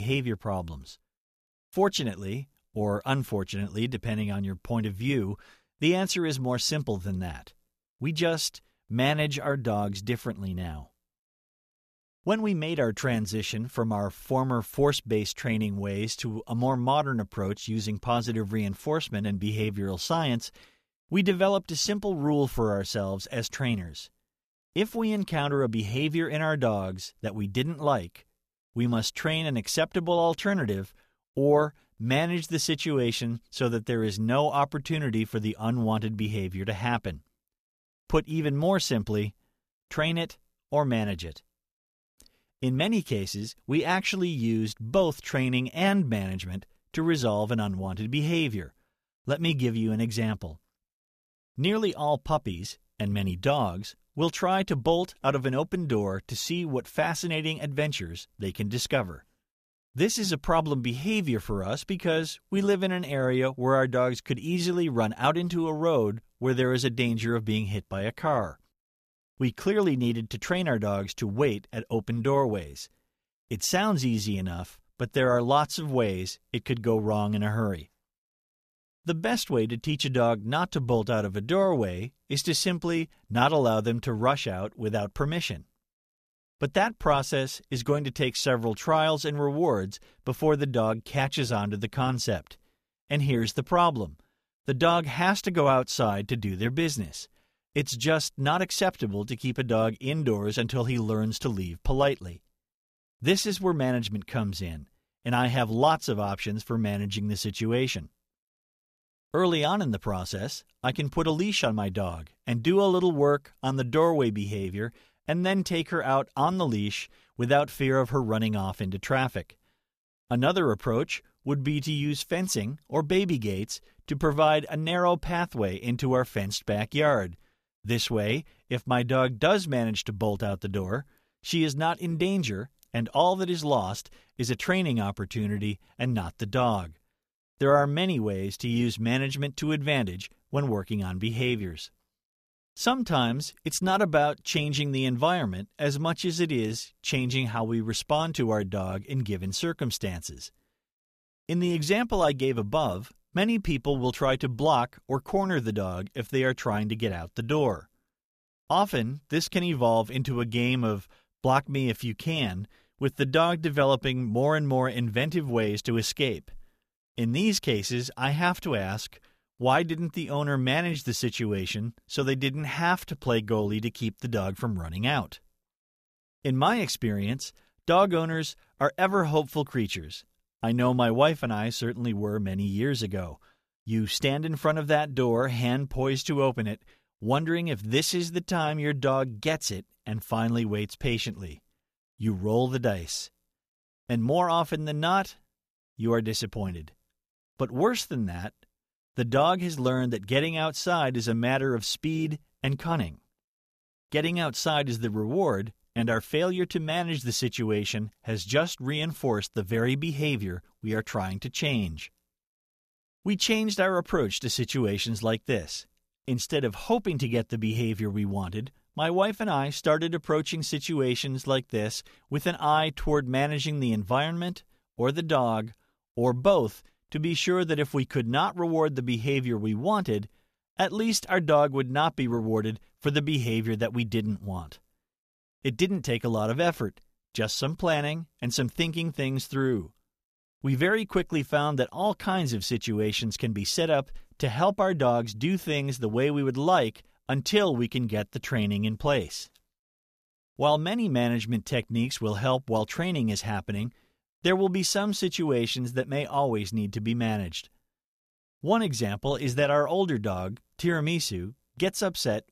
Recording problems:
abrupt cut into speech; at the start

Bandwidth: 14.5 kHz